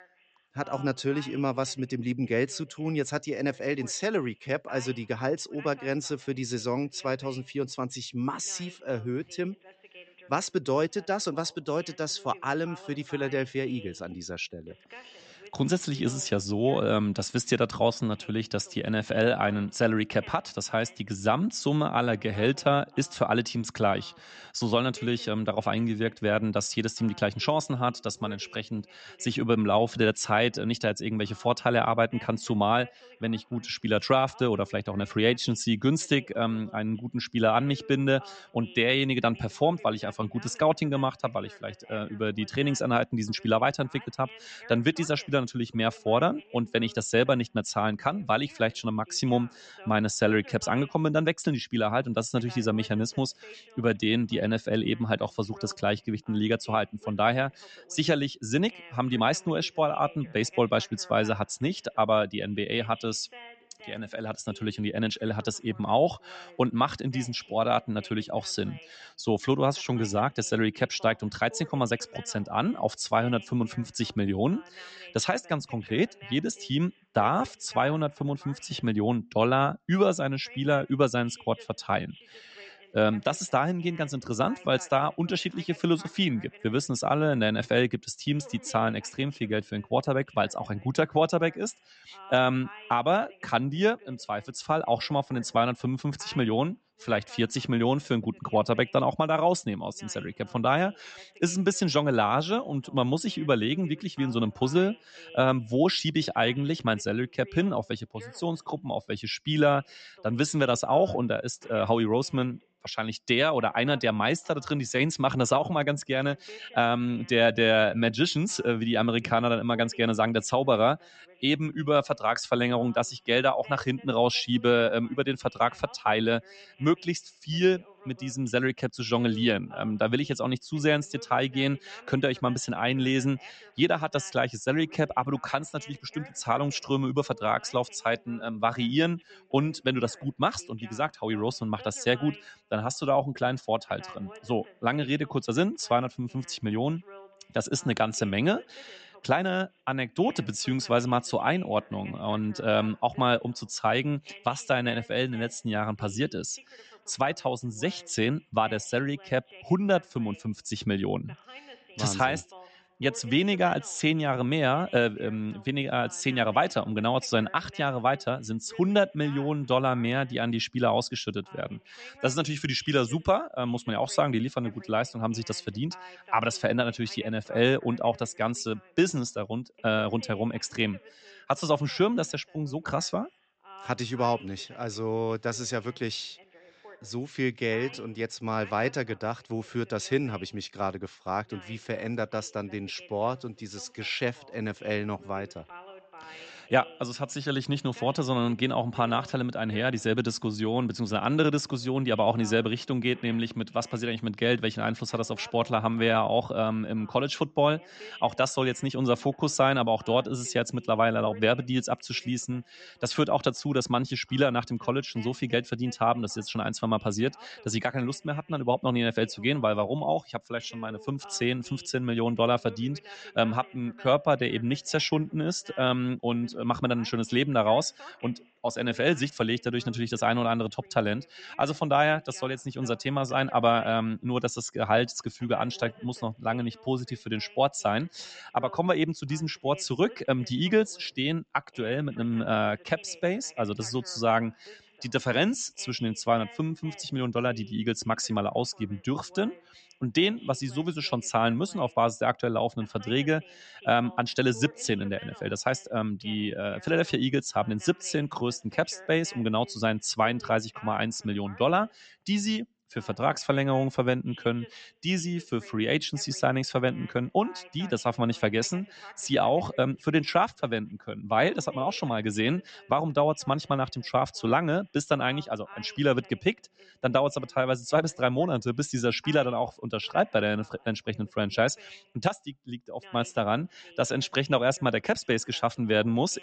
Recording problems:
high frequencies cut off; noticeable; nothing above 8 kHz
voice in the background; faint; throughout; 25 dB below the speech

